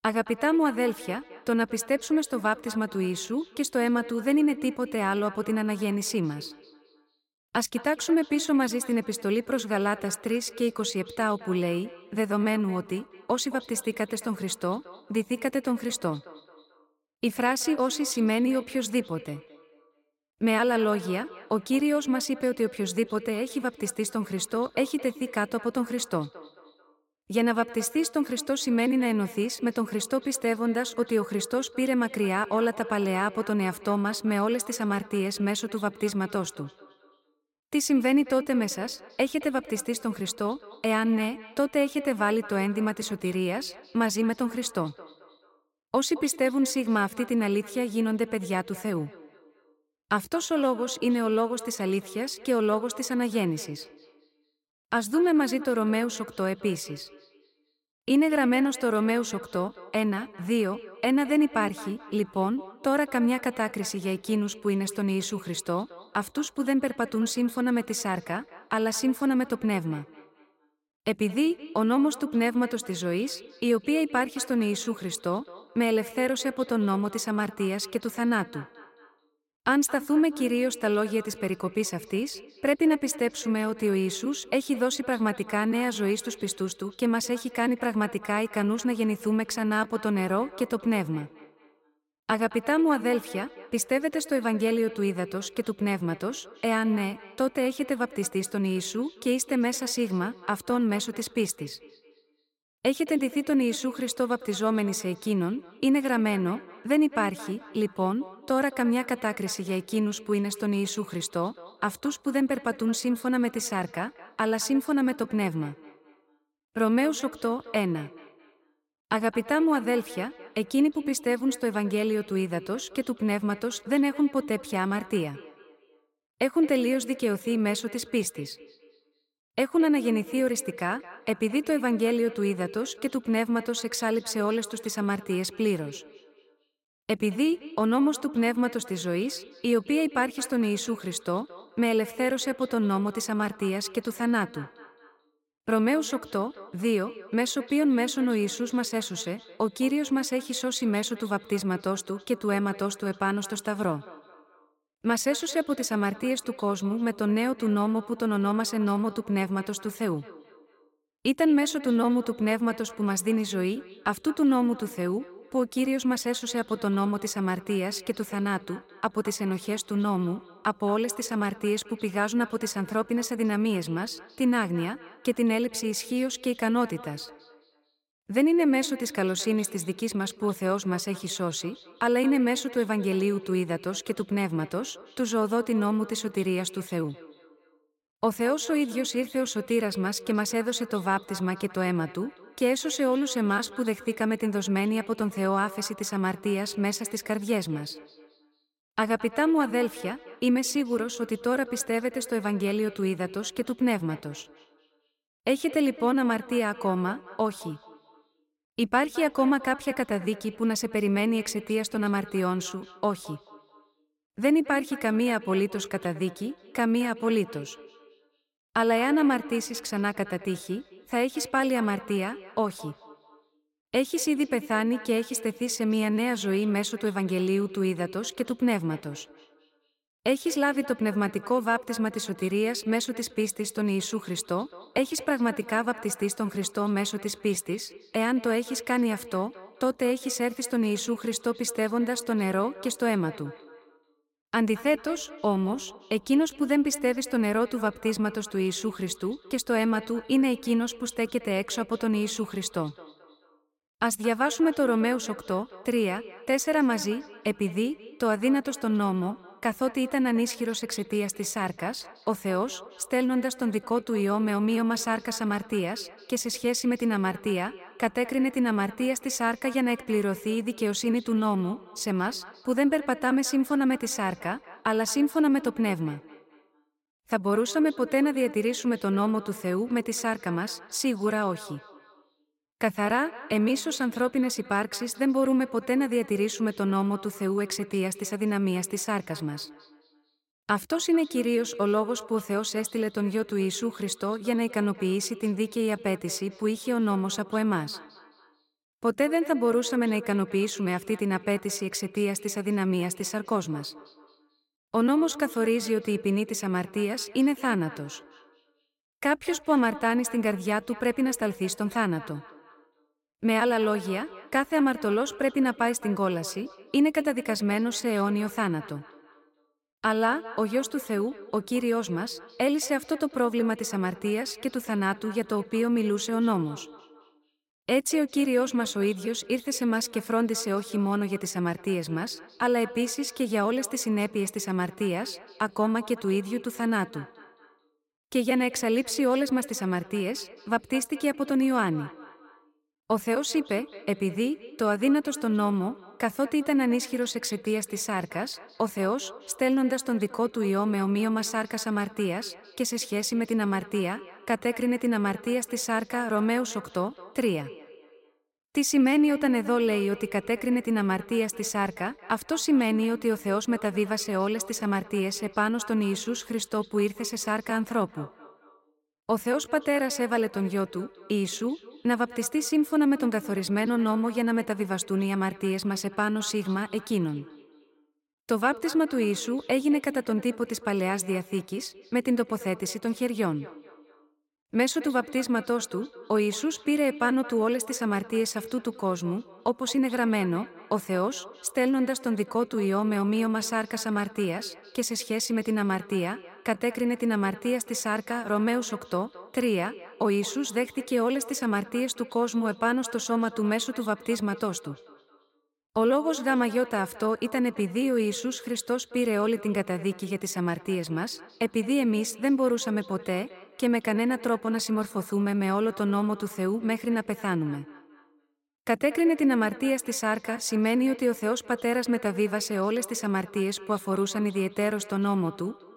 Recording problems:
echo of what is said; faint; throughout; 220 ms later, 20 dB below the speech

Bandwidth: 16 kHz